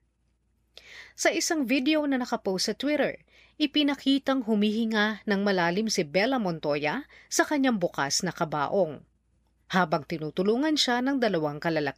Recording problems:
none

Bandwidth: 15 kHz